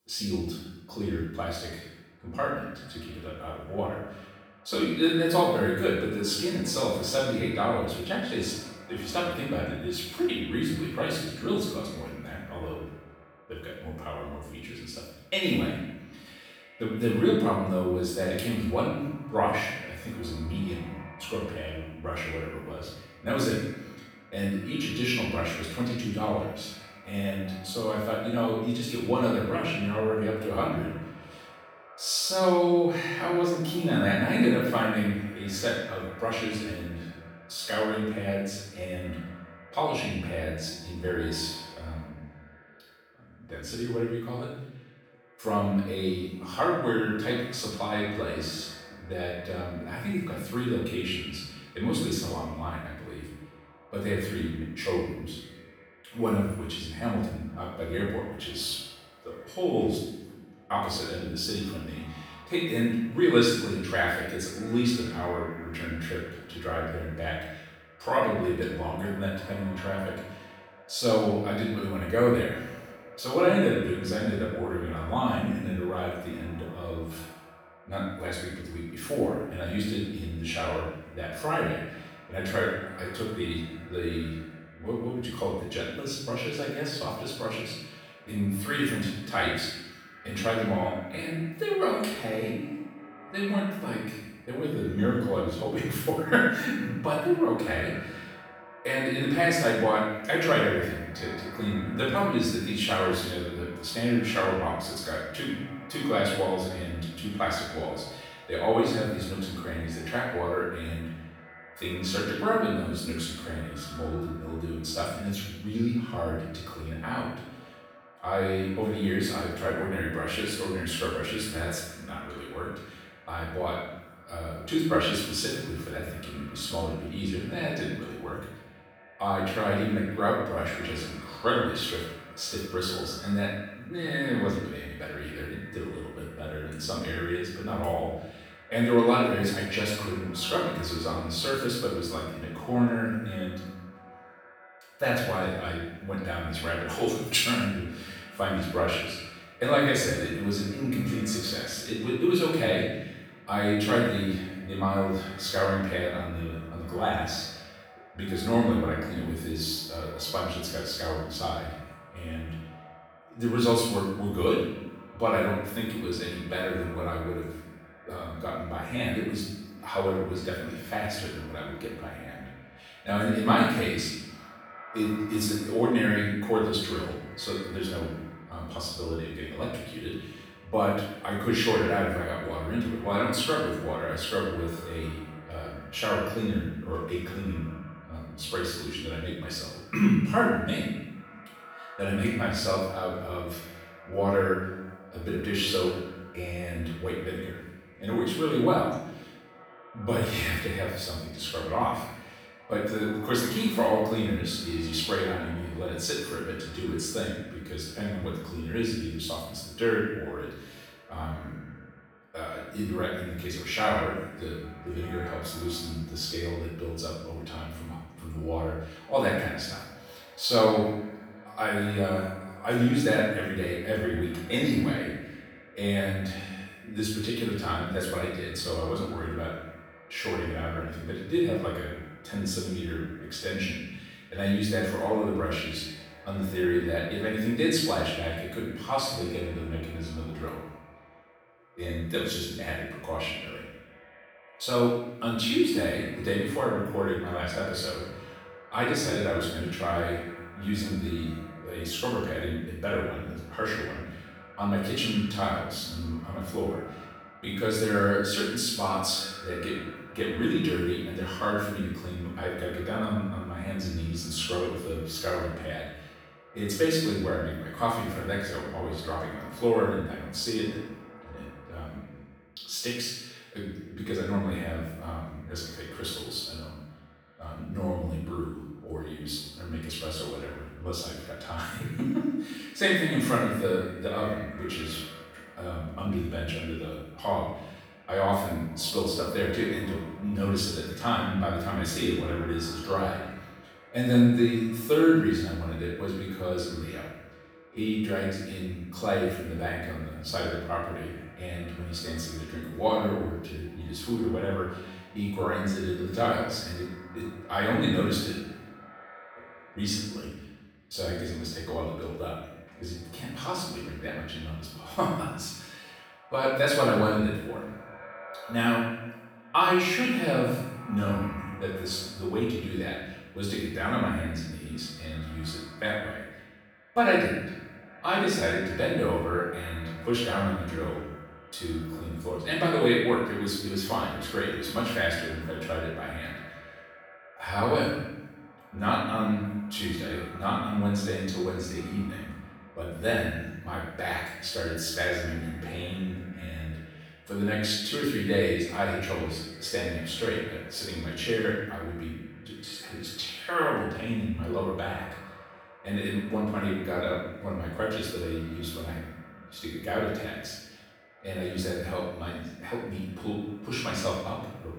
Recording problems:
room echo; strong; dies away in 0.9 s
off-mic speech; far
echo of what is said; faint; throughout; 390 ms later, 20 dB below the speech

